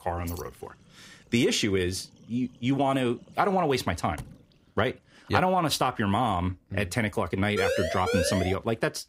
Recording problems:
household noises; faint; throughout; 30 dB below the speech
jangling keys; faint; at 0.5 s; peak 15 dB below the speech
door banging; faint; at 4 s; peak 20 dB below the speech
siren; noticeable; at 7.5 s; peak 1 dB below the speech

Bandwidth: 15.5 kHz